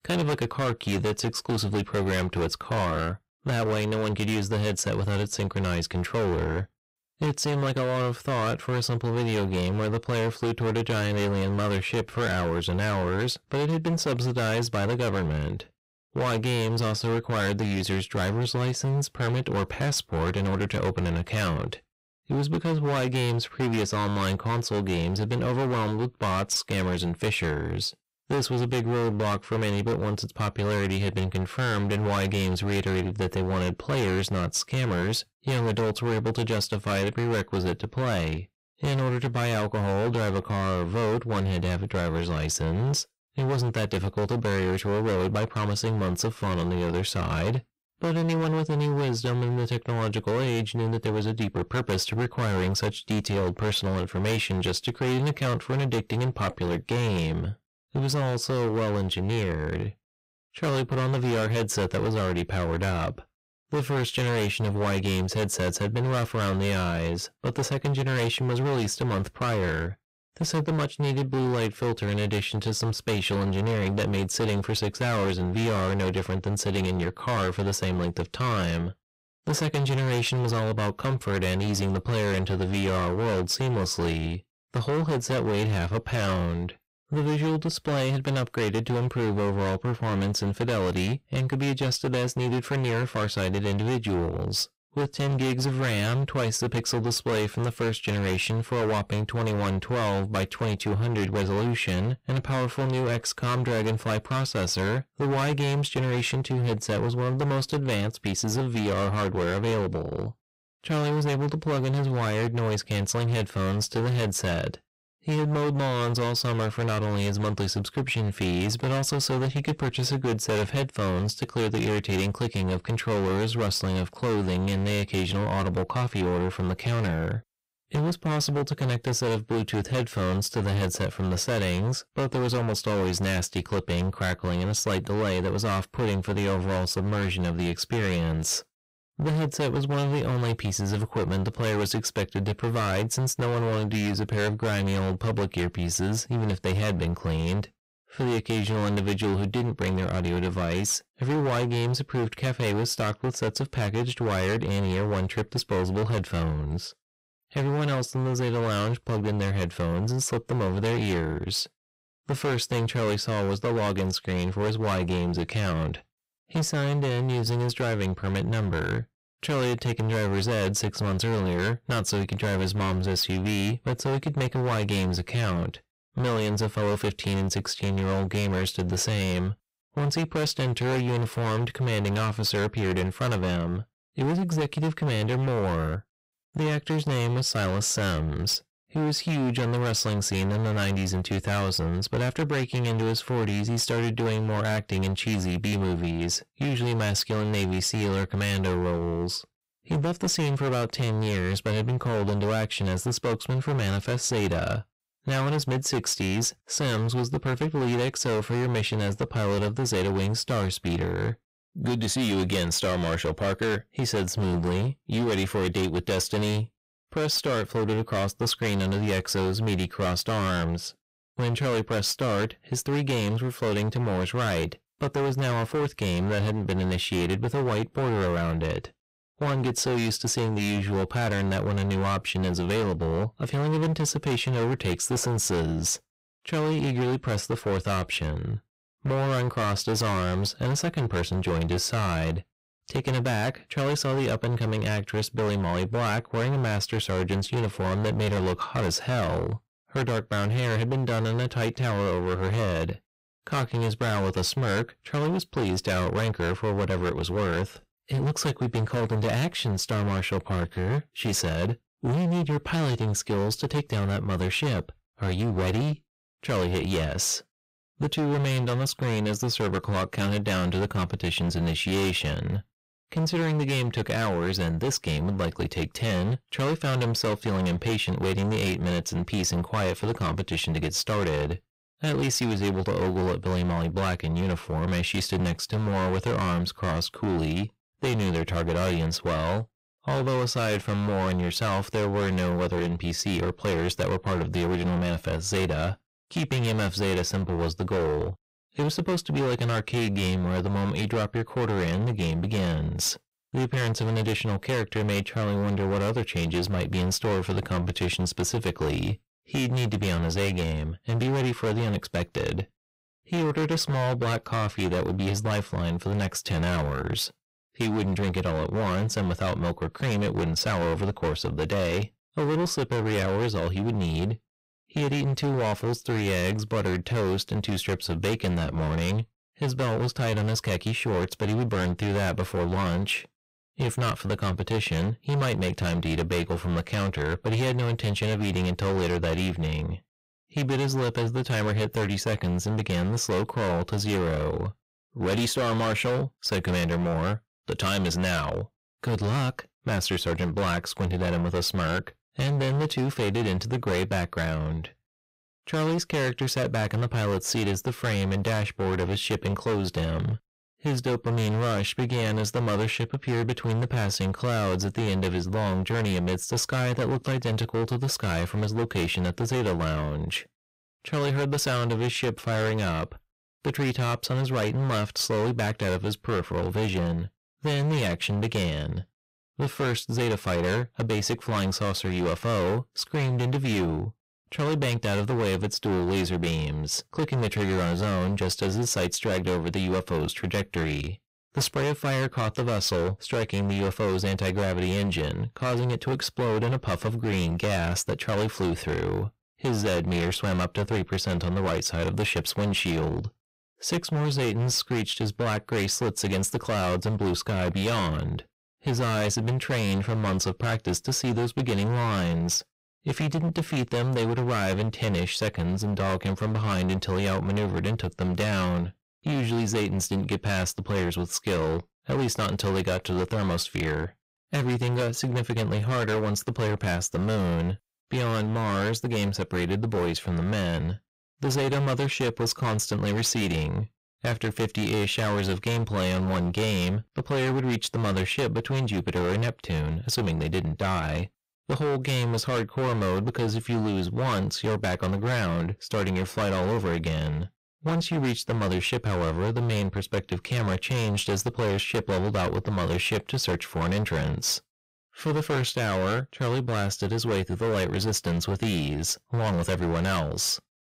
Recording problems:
distortion; heavy; 26% of the sound clipped

